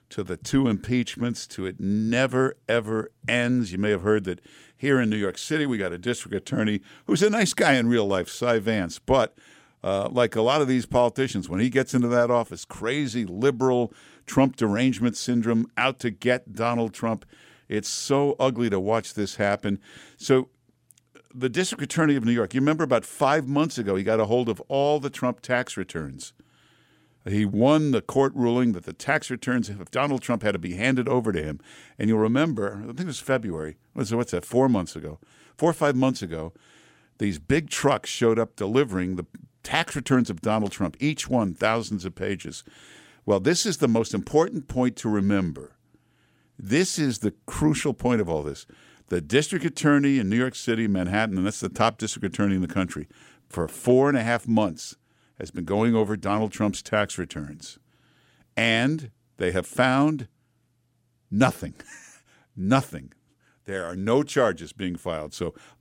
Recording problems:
none

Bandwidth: 16 kHz